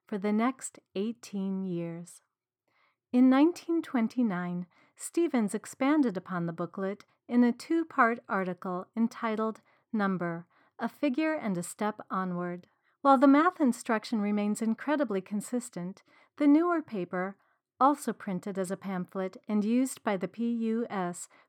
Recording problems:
muffled; slightly; fading above 2.5 kHz

